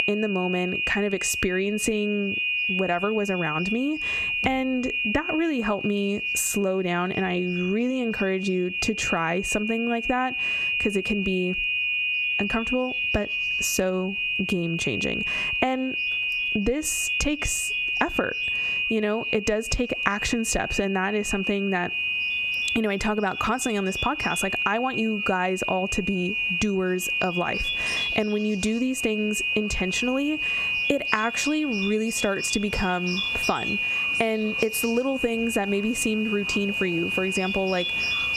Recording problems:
squashed, flat; somewhat, background pumping
high-pitched whine; loud; throughout; 2.5 kHz, 1 dB below the speech
animal sounds; noticeable; throughout; 10 dB below the speech

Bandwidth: 14.5 kHz